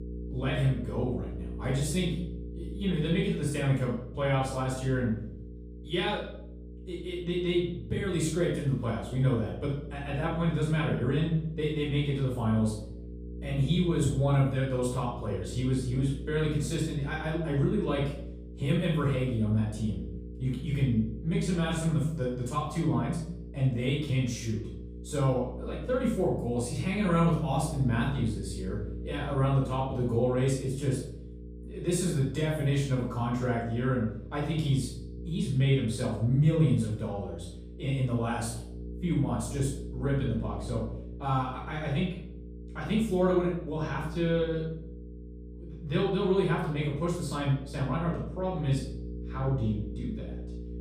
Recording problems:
off-mic speech; far
room echo; noticeable; dies away in 0.6 s
electrical hum; noticeable; throughout; 60 Hz, 15 dB below the speech

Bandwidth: 15 kHz